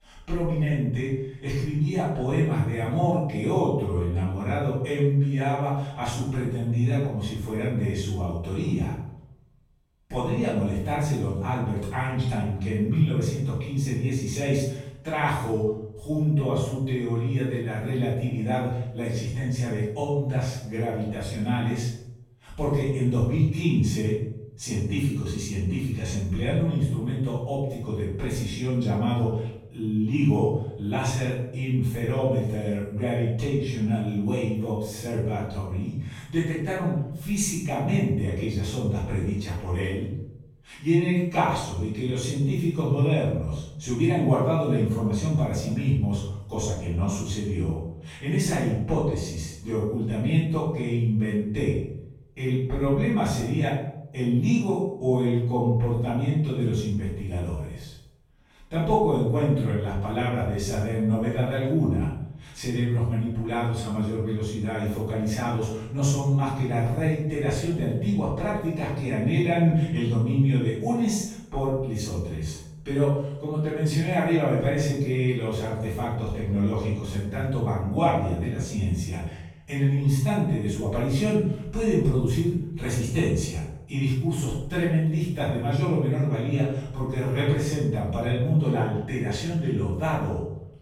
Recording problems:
room echo; strong; dies away in 0.7 s
off-mic speech; far

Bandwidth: 16.5 kHz